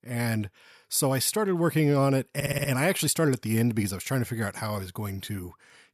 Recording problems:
audio stuttering; at 2.5 s

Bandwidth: 14 kHz